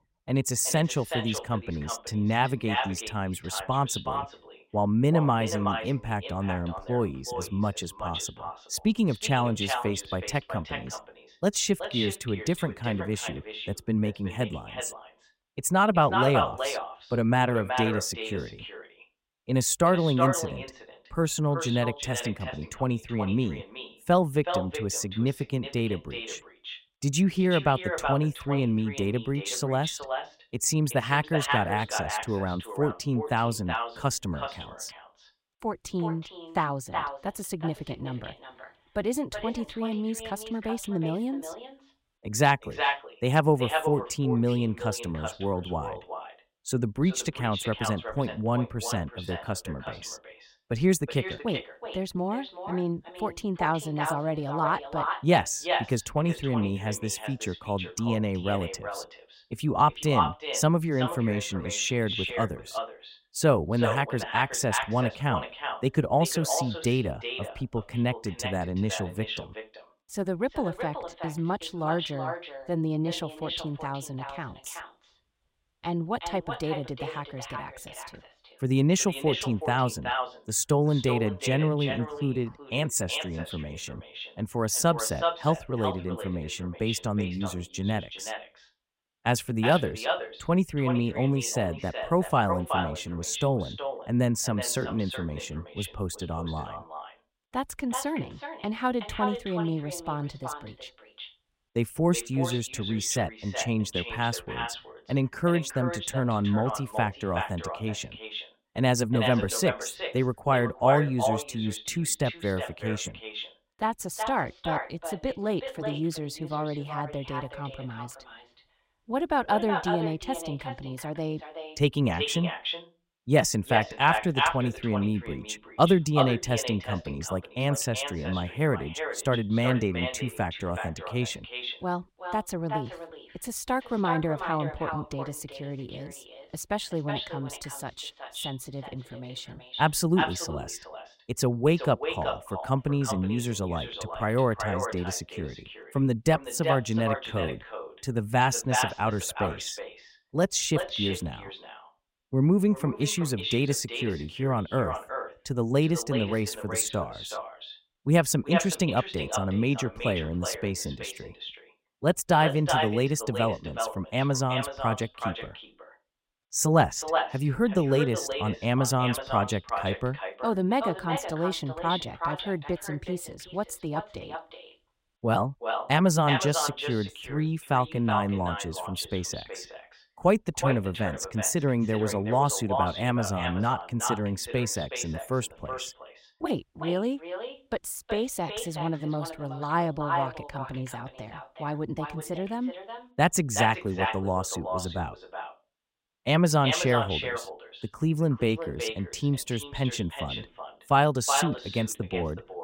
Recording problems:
echo of what is said; strong; throughout; 370 ms later, 7 dB below the speech

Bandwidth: 16 kHz